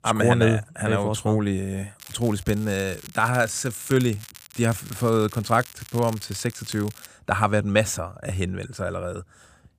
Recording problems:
crackling; noticeable; from 2 to 7 s; 15 dB below the speech

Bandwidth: 15 kHz